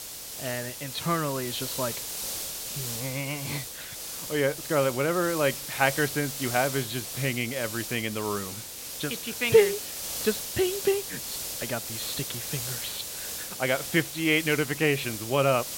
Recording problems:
high frequencies cut off; severe; nothing above 4.5 kHz
hiss; loud; throughout; 5 dB below the speech

